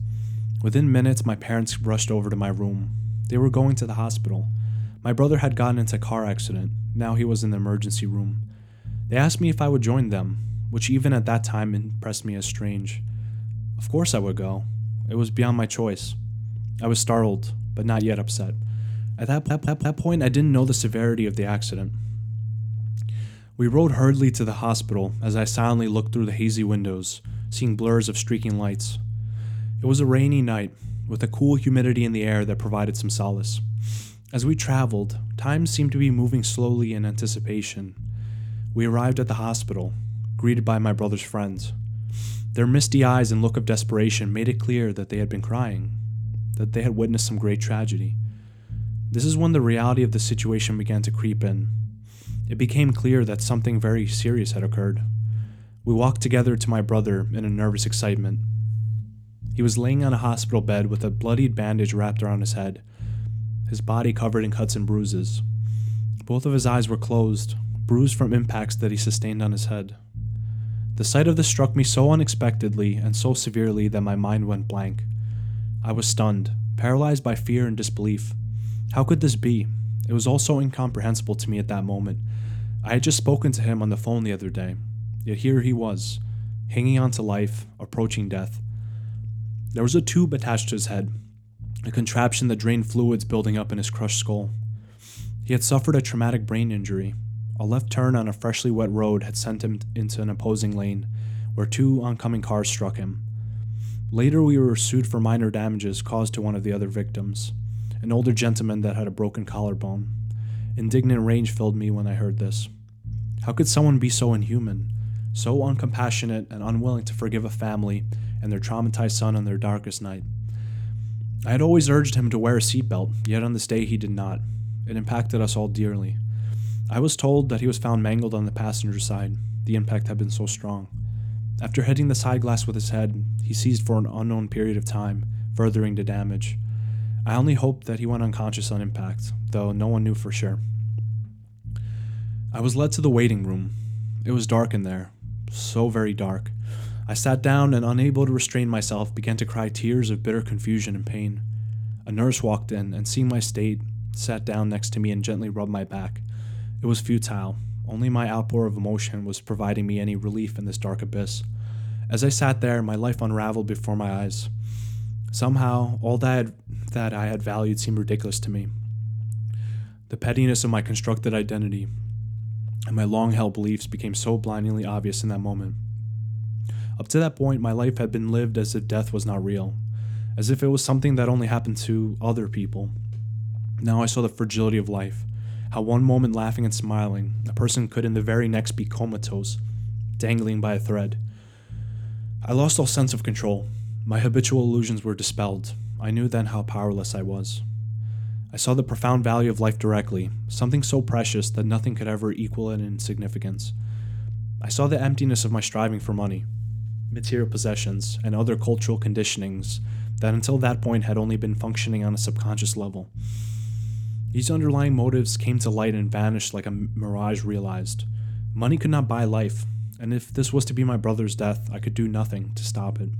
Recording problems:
low rumble; noticeable; throughout; 15 dB below the speech
audio stuttering; at 19 s

